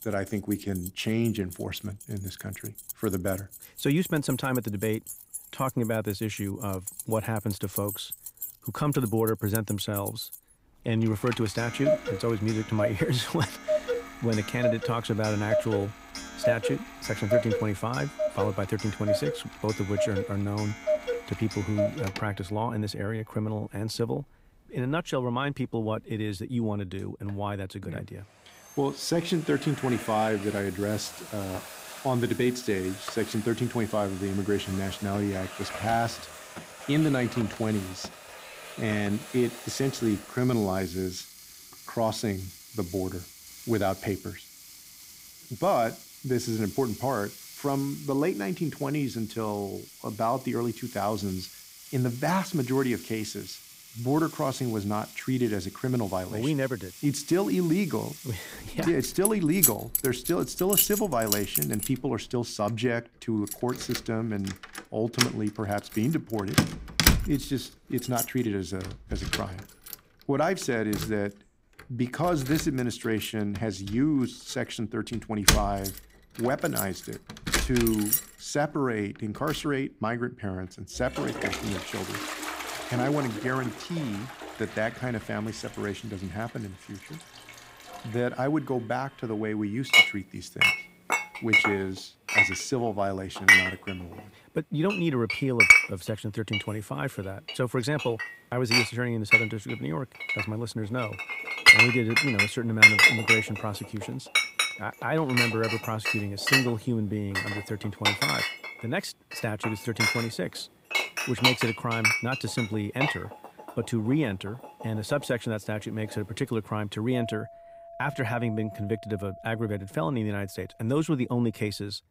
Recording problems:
household noises; very loud; throughout; 4 dB above the speech

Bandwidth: 15.5 kHz